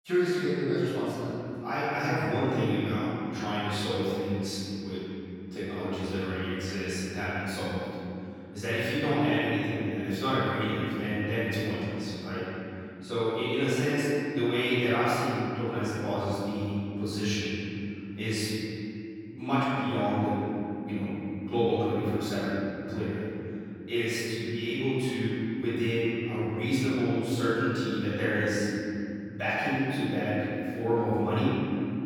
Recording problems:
room echo; strong; dies away in 3 s
off-mic speech; far

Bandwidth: 17.5 kHz